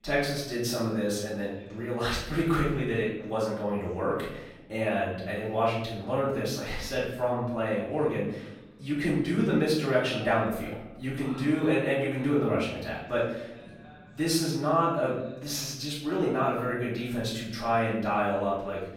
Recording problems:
off-mic speech; far
room echo; noticeable; dies away in 0.8 s
voice in the background; faint; throughout; 25 dB below the speech

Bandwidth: 16 kHz